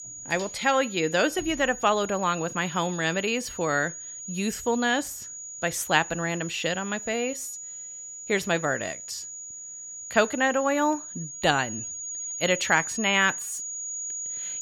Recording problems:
high-pitched whine; loud; throughout; 6.5 kHz, 9 dB below the speech

